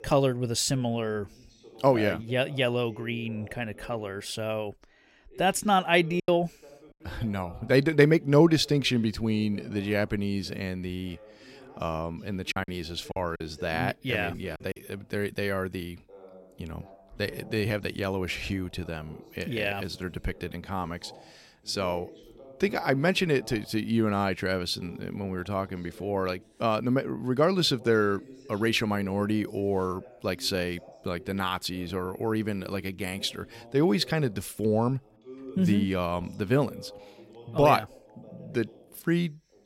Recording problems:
voice in the background; faint; throughout; 20 dB below the speech
choppy; very; at 6 s and from 13 to 15 s; 7% of the speech affected

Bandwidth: 16 kHz